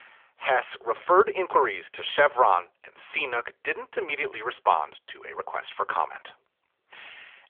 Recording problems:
phone-call audio; nothing above 3.5 kHz

